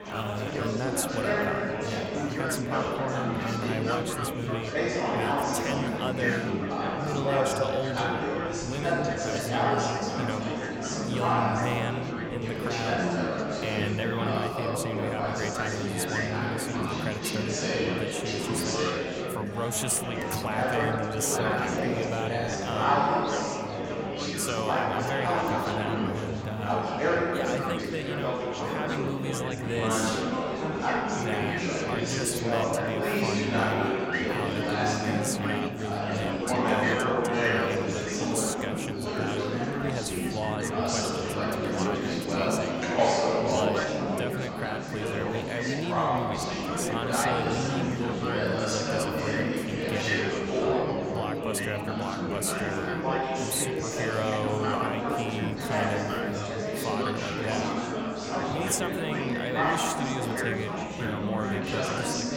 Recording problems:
chatter from many people; very loud; throughout; 5 dB above the speech

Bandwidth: 16.5 kHz